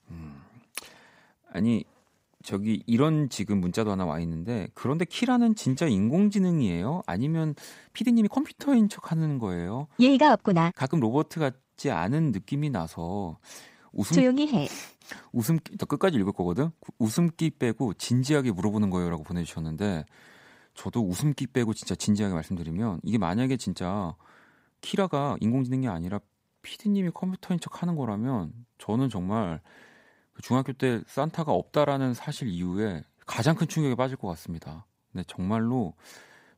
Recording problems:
uneven, jittery; strongly; from 2.5 to 33 s

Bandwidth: 15.5 kHz